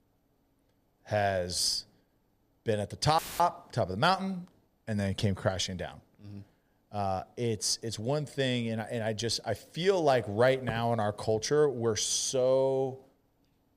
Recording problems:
audio cutting out; filled with static; at 3 s

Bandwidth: 15 kHz